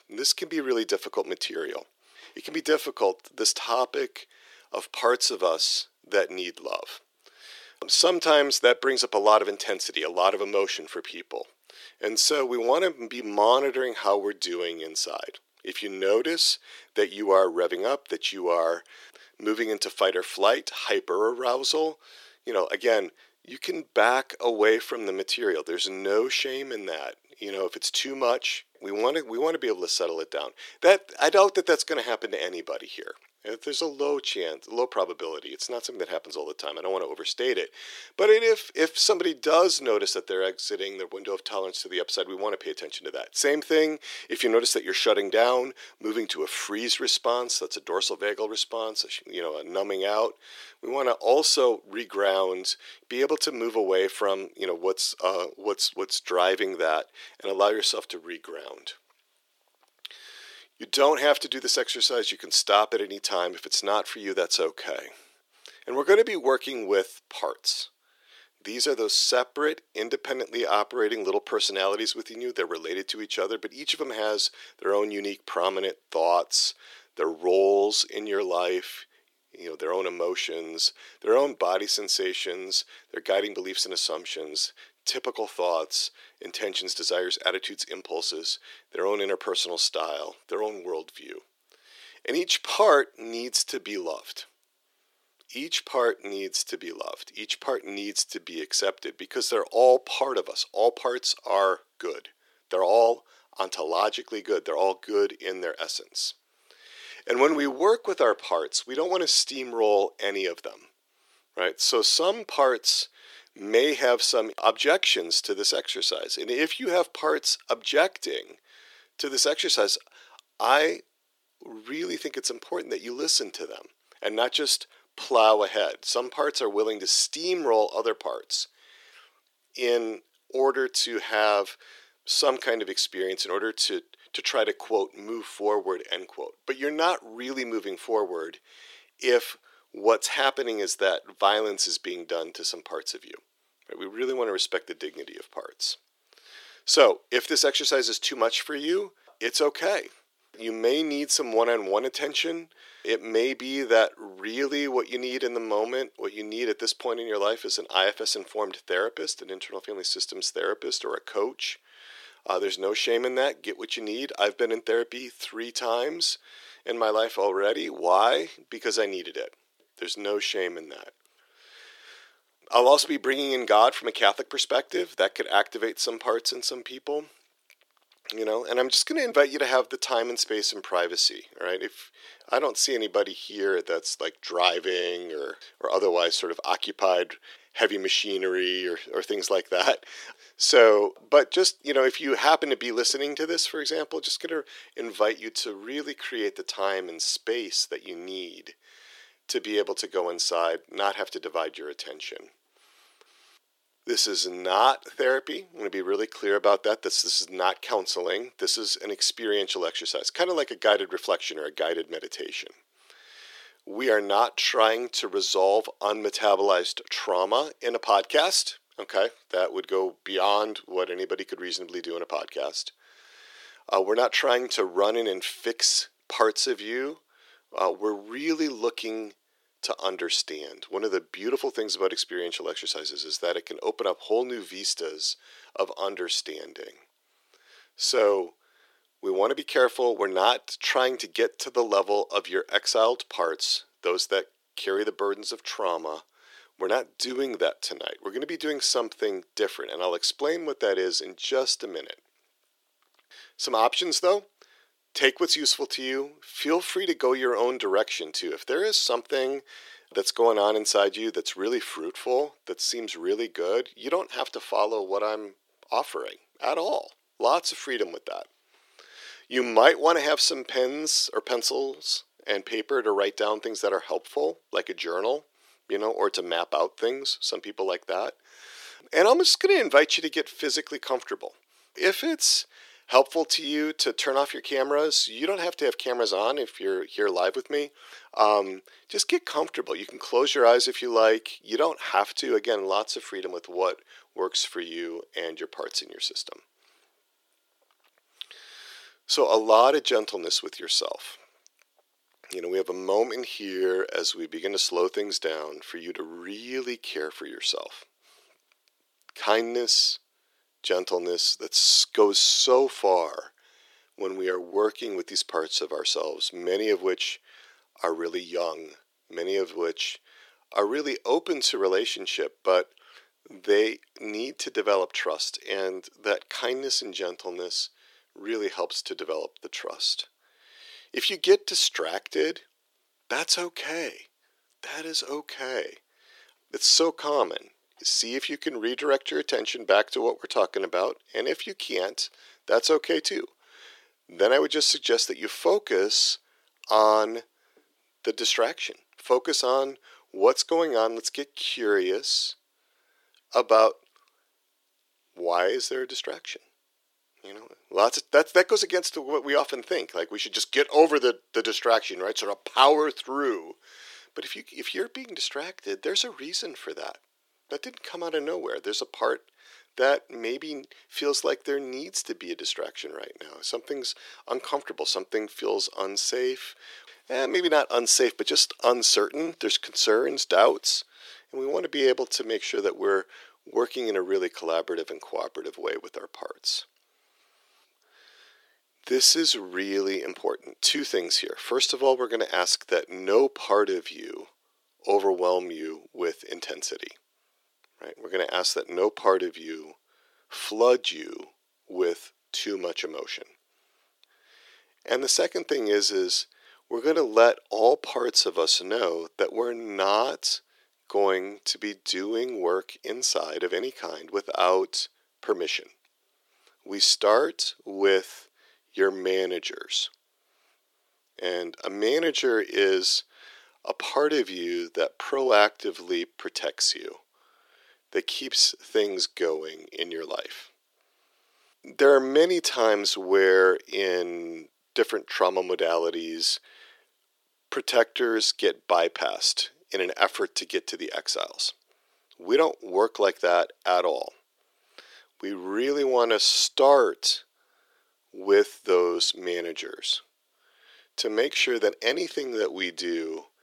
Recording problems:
thin; very; fading below 350 Hz

